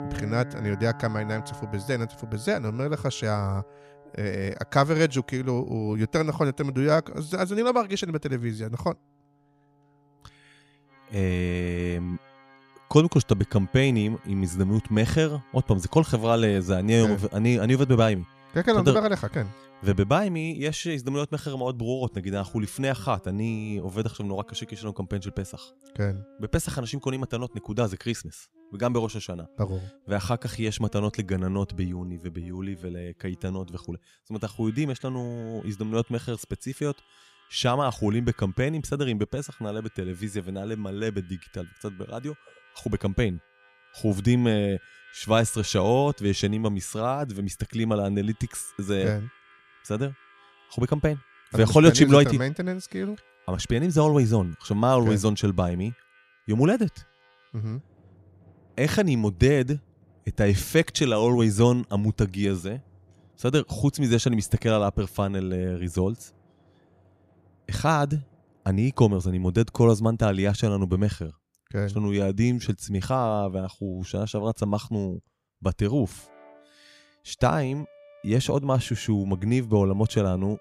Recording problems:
background music; faint; throughout; 25 dB below the speech

